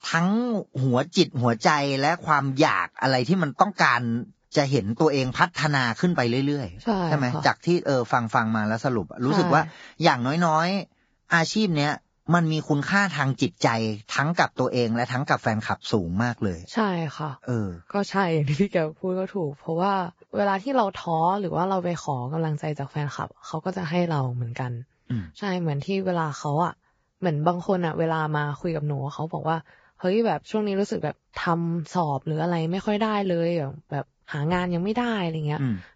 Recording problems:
garbled, watery; badly; nothing above 7.5 kHz

